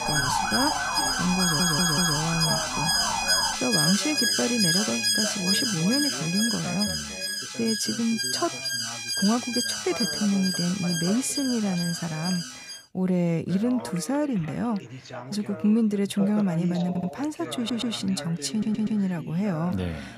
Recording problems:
alarms or sirens; very loud; until 13 s; 2 dB above the speech
background chatter; noticeable; throughout; 2 voices, 10 dB below the speech
siren; loud; until 3.5 s; peak 1 dB above the speech
audio stuttering; 4 times, first at 1.5 s

